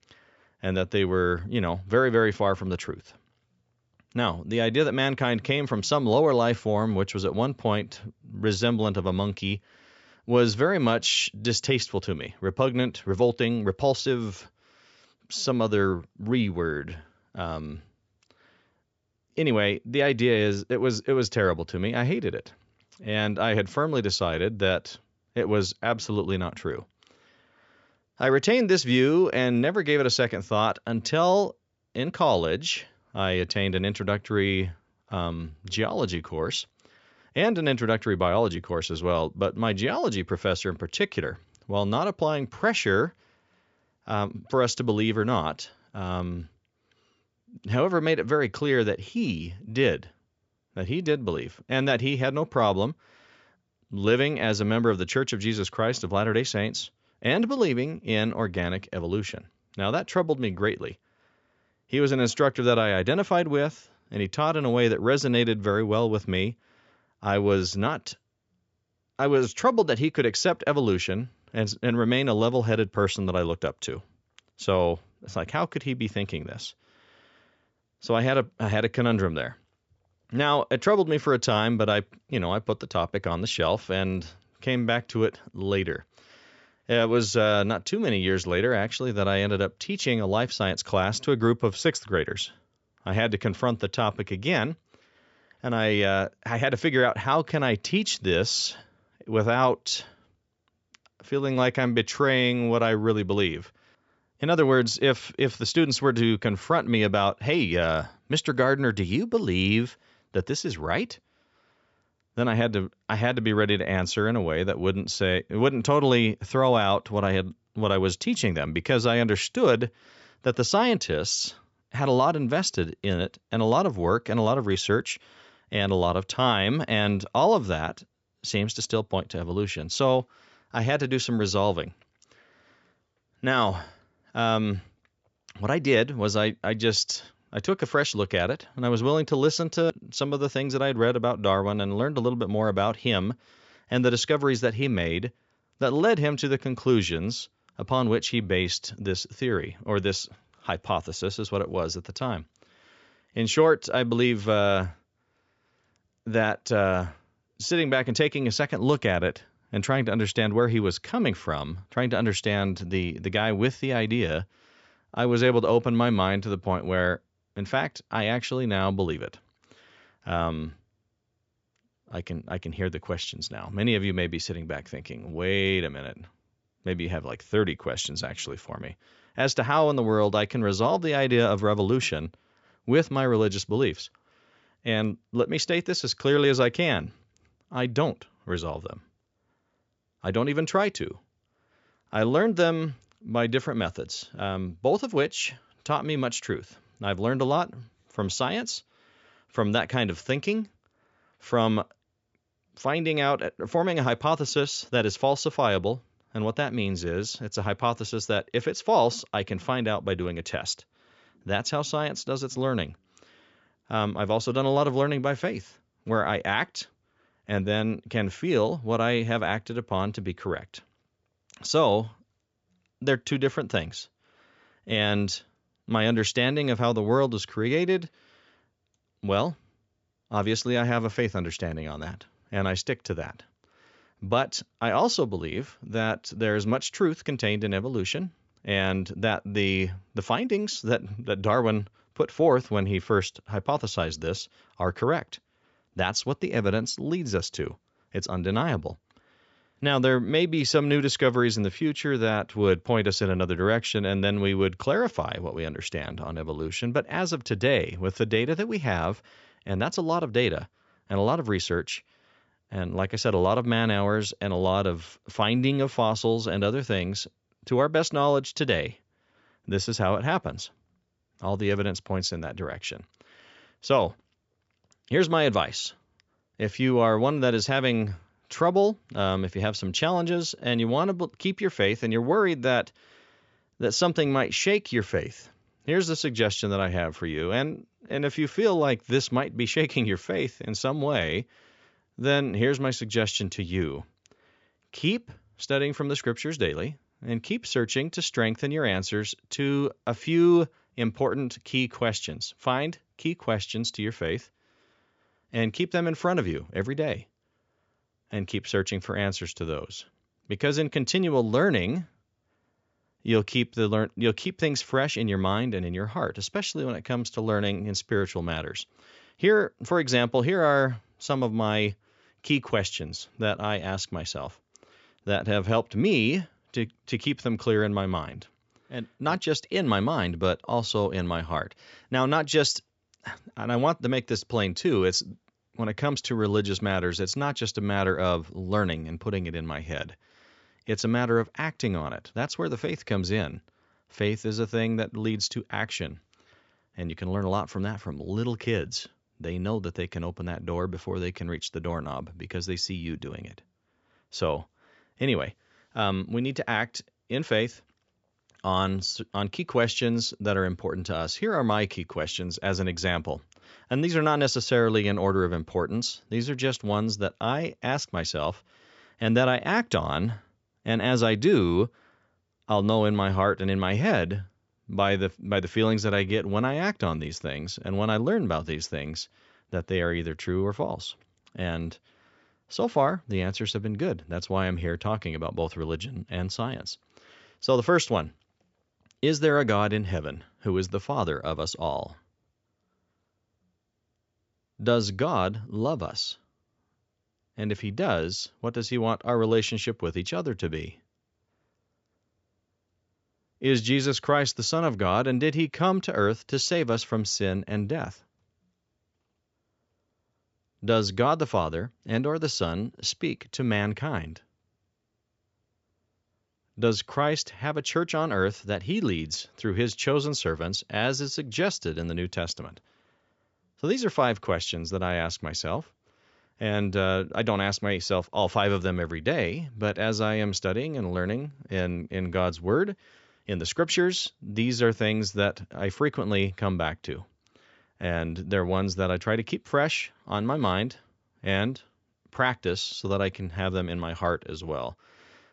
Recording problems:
high frequencies cut off; noticeable; nothing above 8 kHz

